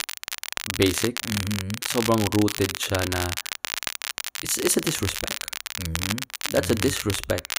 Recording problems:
crackle, like an old record; loud; 3 dB below the speech

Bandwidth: 15.5 kHz